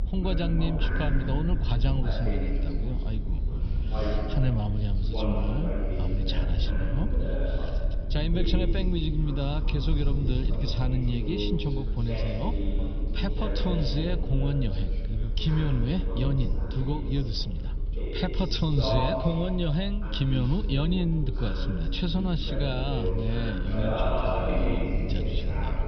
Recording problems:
high frequencies cut off; noticeable; nothing above 5.5 kHz
room echo; very slight; dies away in 3 s
background chatter; loud; throughout; 2 voices, 5 dB below the speech
low rumble; noticeable; throughout; 15 dB below the speech

